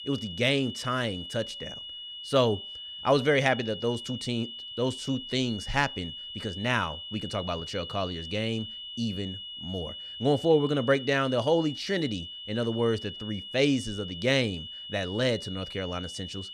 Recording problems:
high-pitched whine; loud; throughout; 3 kHz, 9 dB below the speech

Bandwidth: 15.5 kHz